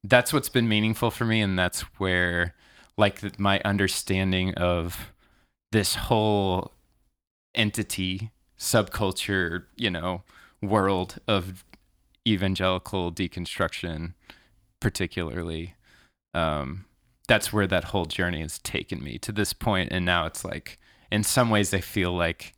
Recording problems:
none

